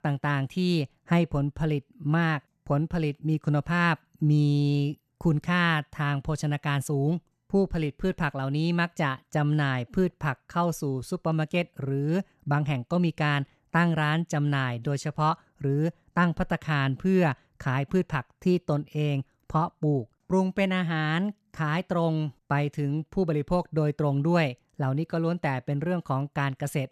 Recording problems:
none

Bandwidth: 13.5 kHz